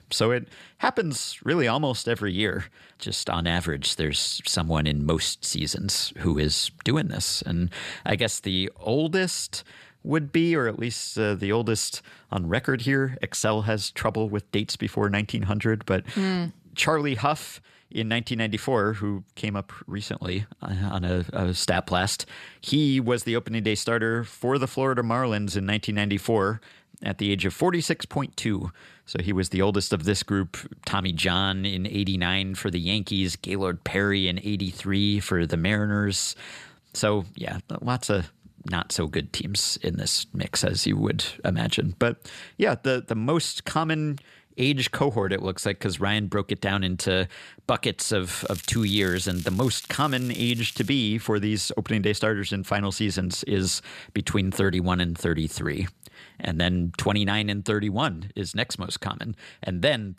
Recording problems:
crackling; noticeable; from 48 to 51 s; 15 dB below the speech

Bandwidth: 14.5 kHz